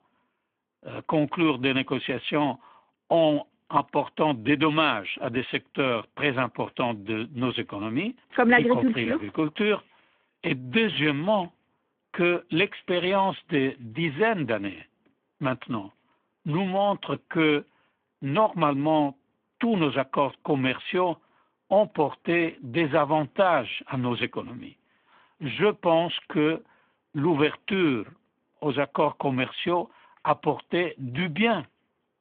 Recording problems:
phone-call audio

